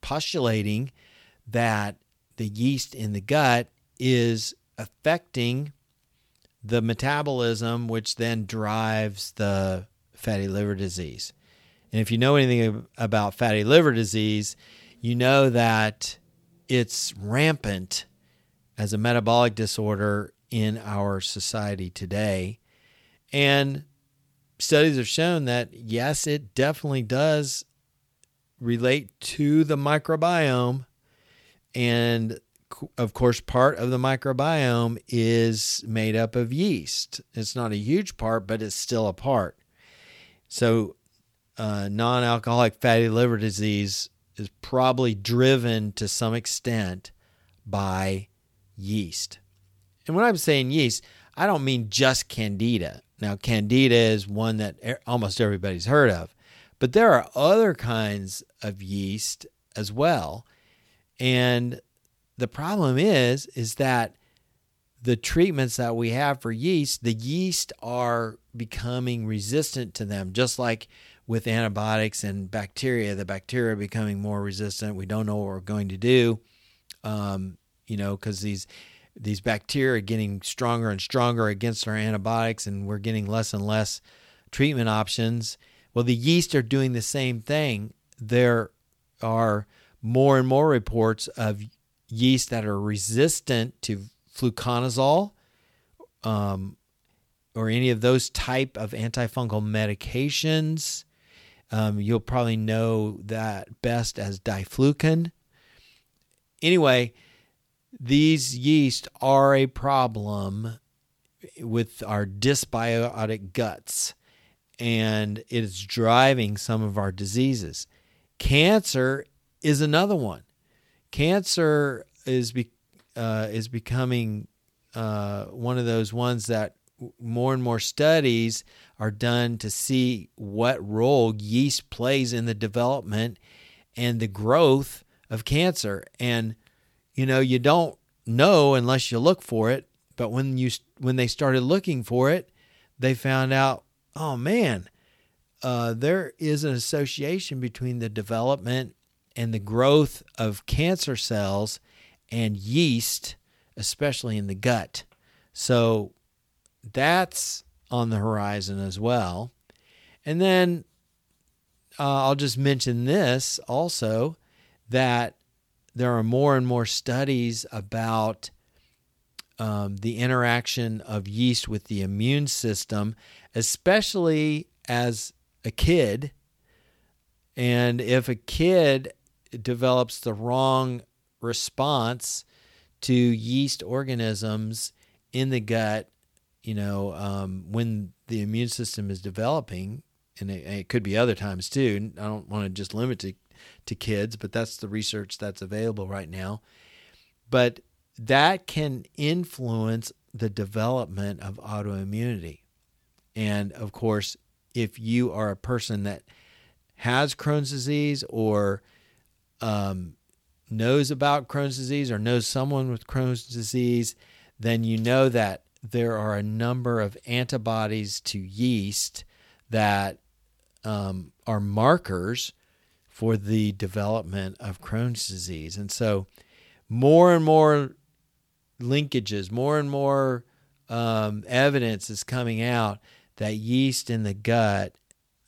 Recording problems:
none

